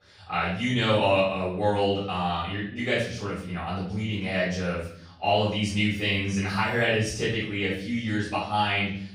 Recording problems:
off-mic speech; far
room echo; noticeable; dies away in 0.7 s

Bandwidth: 15.5 kHz